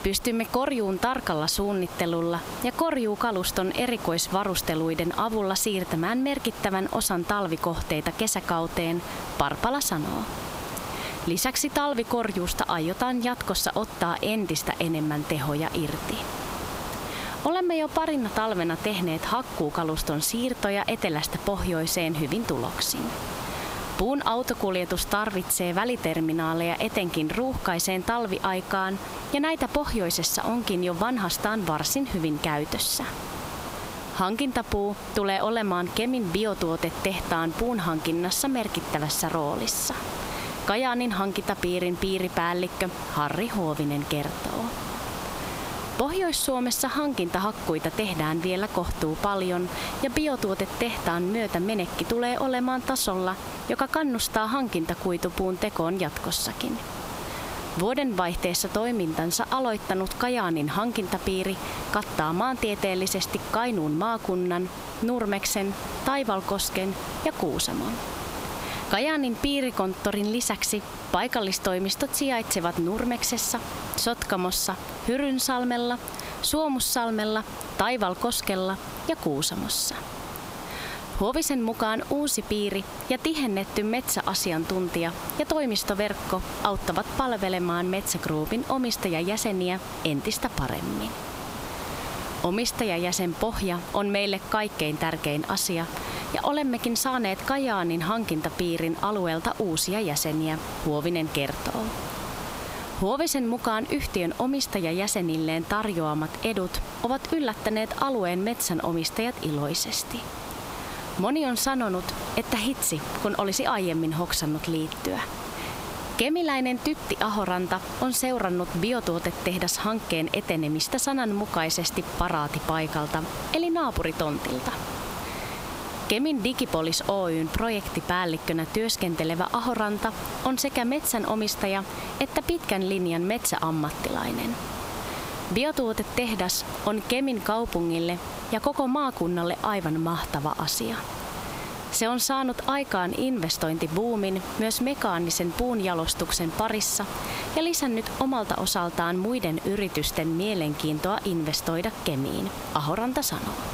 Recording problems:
squashed, flat; heavily
hiss; noticeable; throughout; 10 dB below the speech

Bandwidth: 15.5 kHz